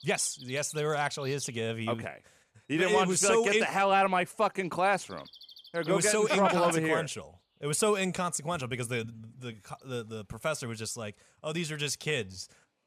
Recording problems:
animal sounds; faint; throughout; 20 dB below the speech

